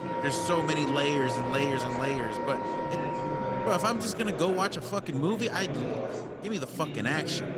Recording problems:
garbled, watery; slightly; nothing above 19 kHz
background music; loud; throughout; 3 dB below the speech
chatter from many people; loud; throughout; 6 dB below the speech

